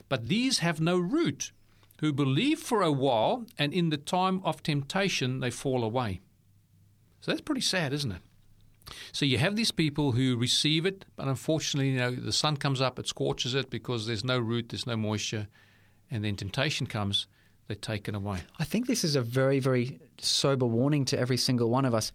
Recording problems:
none

